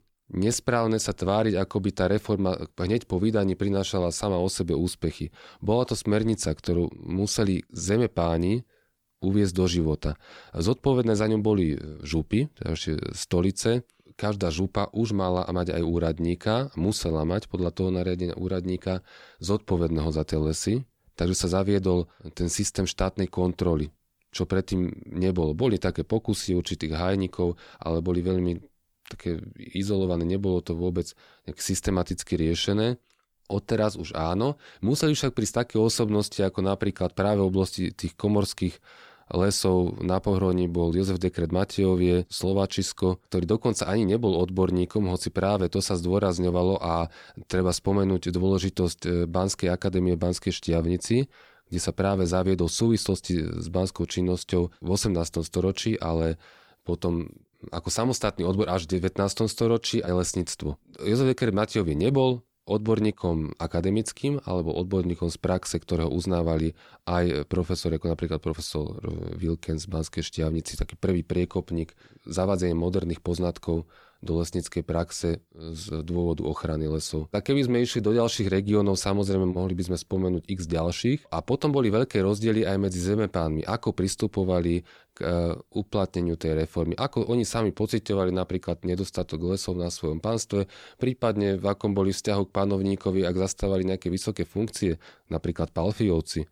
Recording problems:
none

